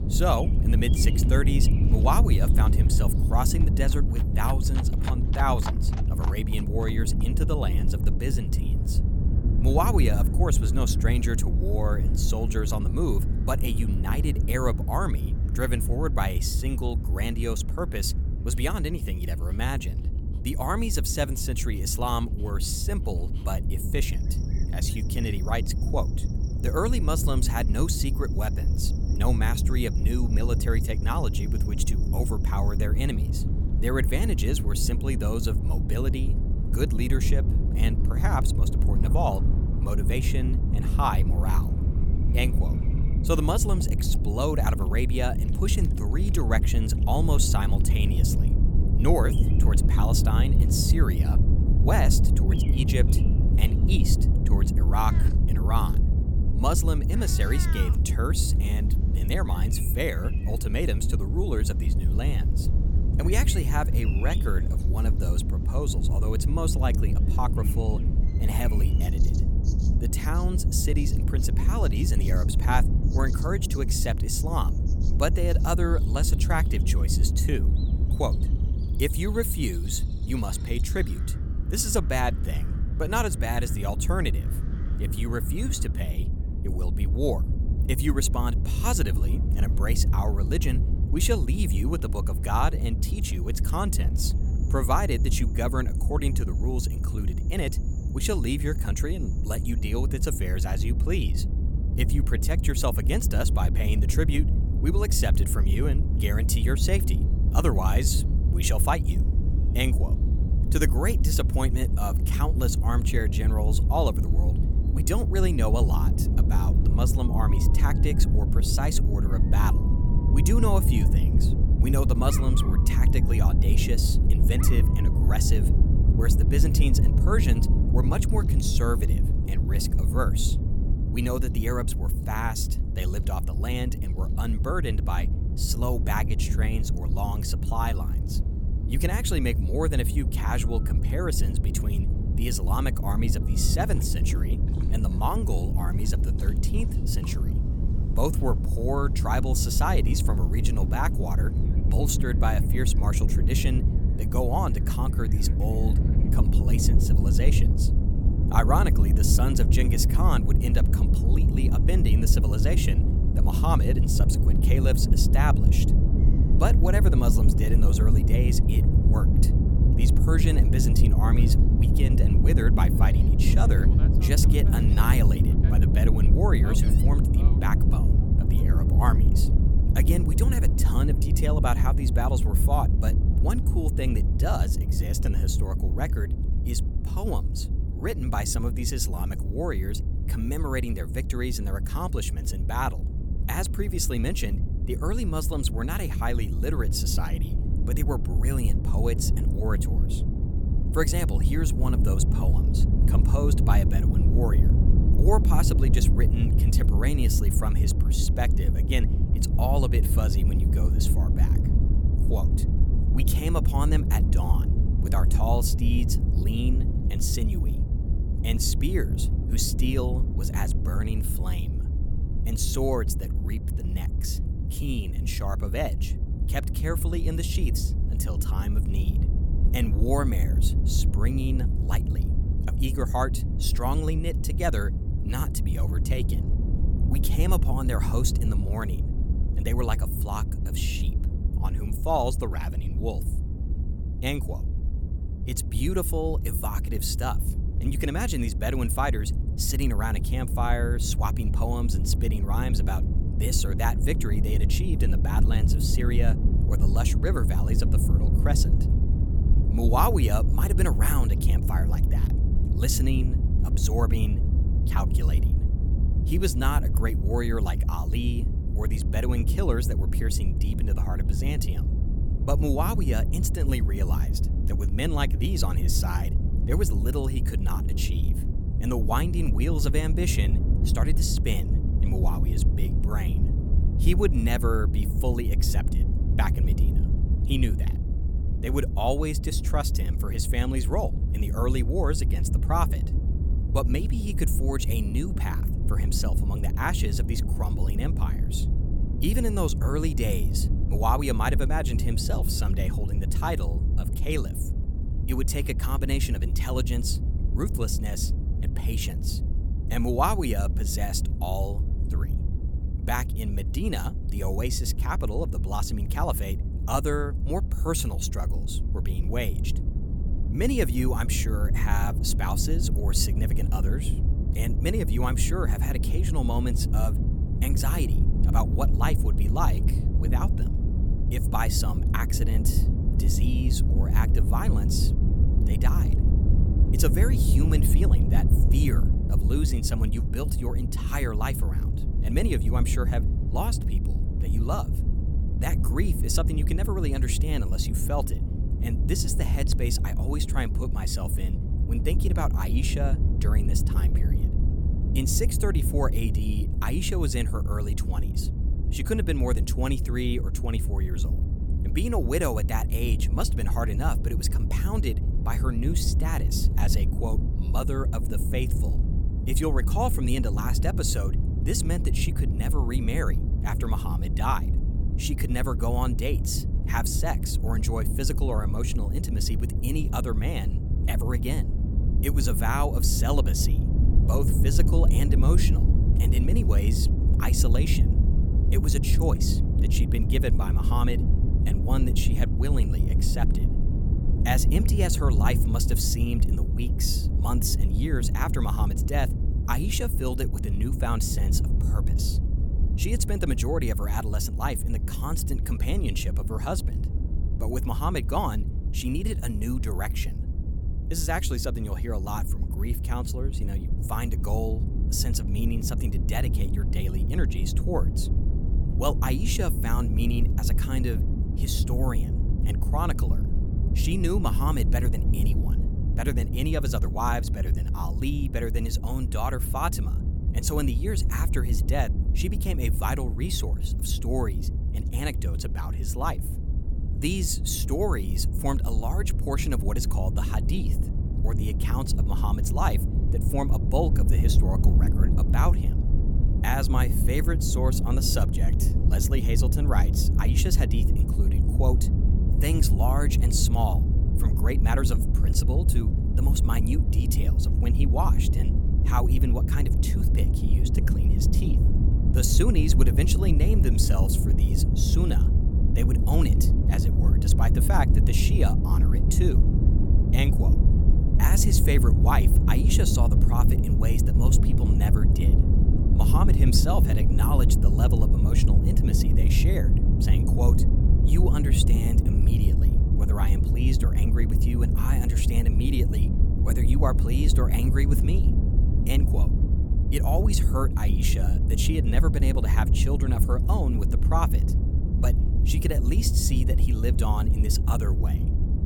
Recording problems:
low rumble; loud; throughout; 7 dB below the speech
animal sounds; noticeable; until 2:59; 20 dB below the speech

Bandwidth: 18 kHz